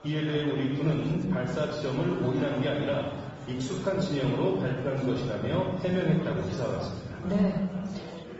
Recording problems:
room echo; noticeable; dies away in 1.6 s
high frequencies cut off; noticeable; nothing above 7.5 kHz
off-mic speech; somewhat distant
garbled, watery; slightly
murmuring crowd; noticeable; throughout; 15 dB below the speech

